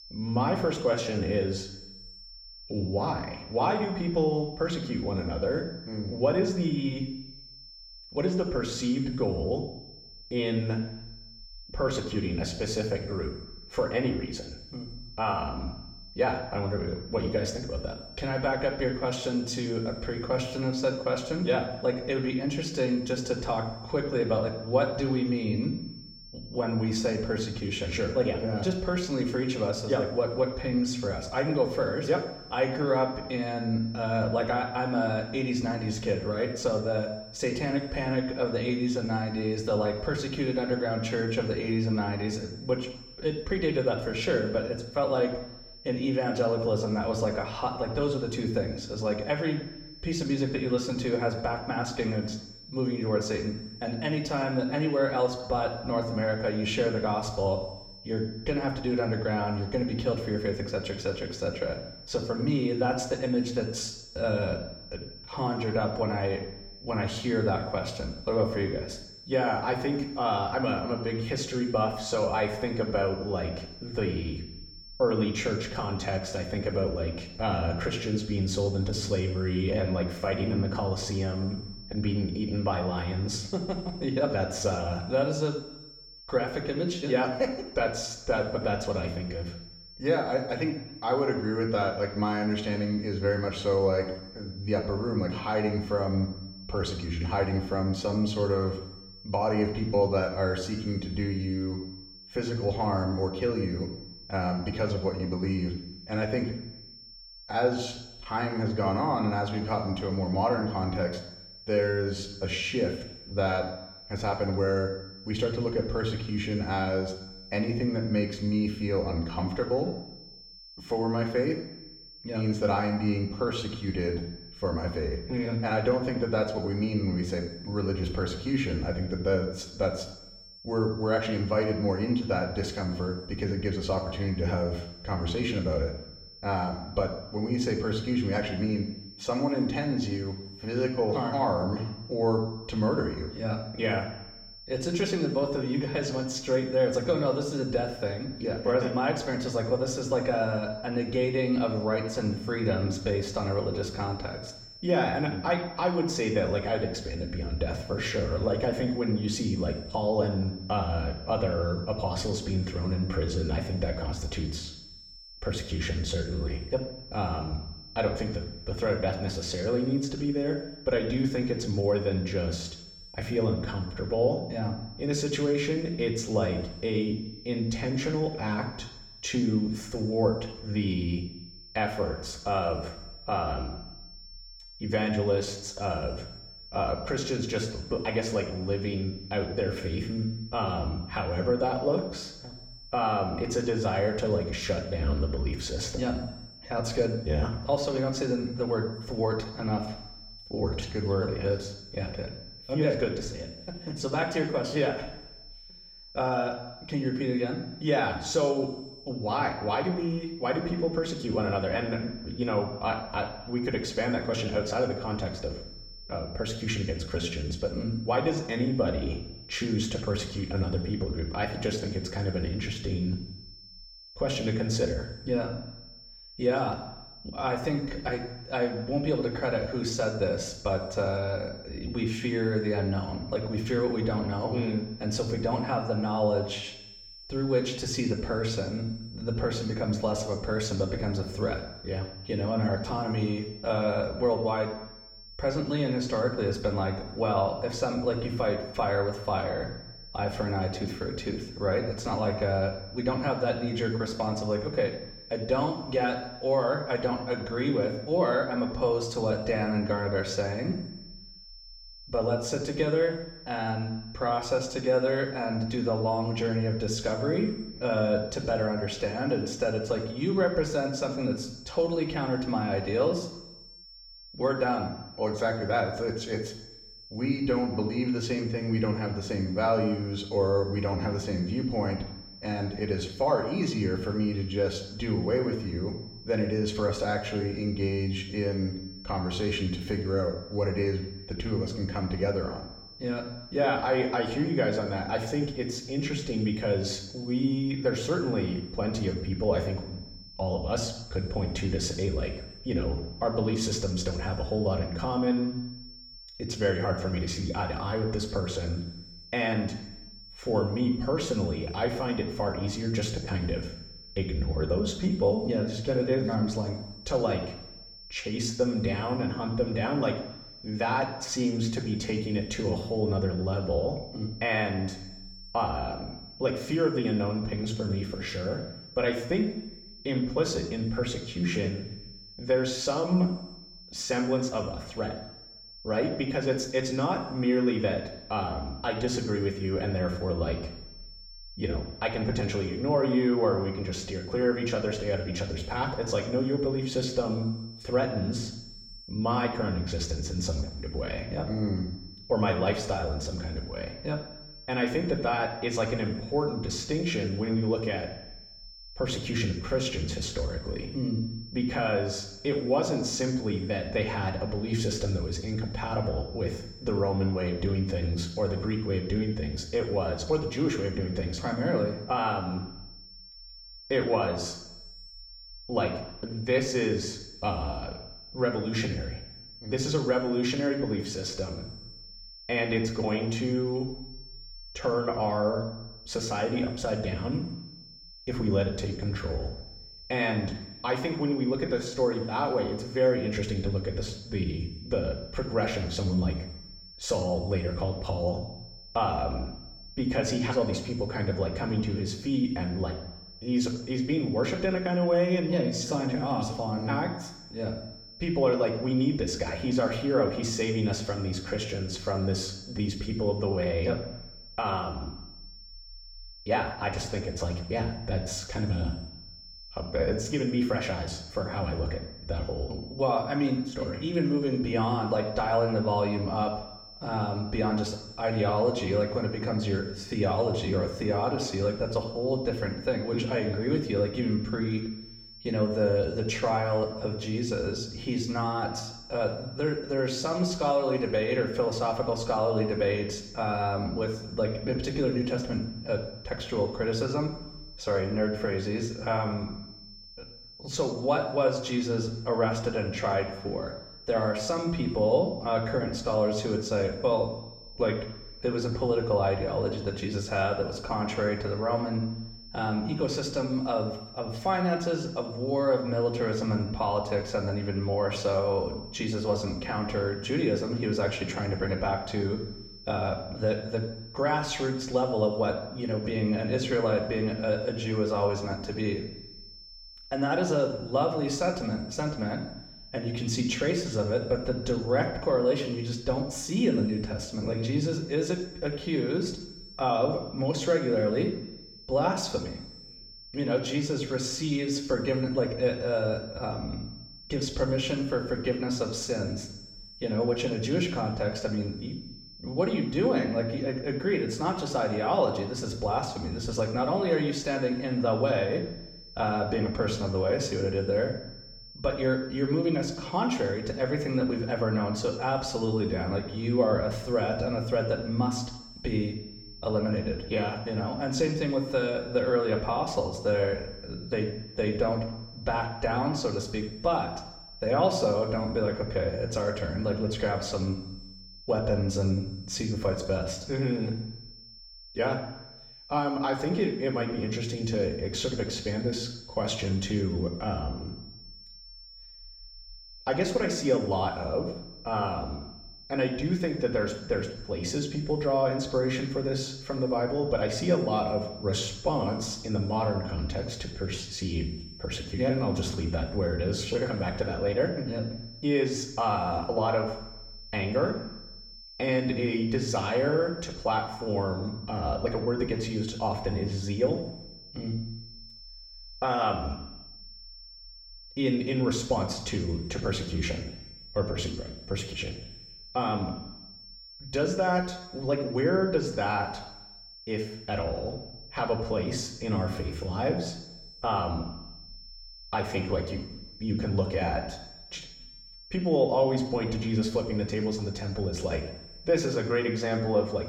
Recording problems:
room echo; slight; dies away in 0.8 s
off-mic speech; somewhat distant
high-pitched whine; noticeable; throughout; 5.5 kHz, 15 dB below the speech

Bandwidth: 17 kHz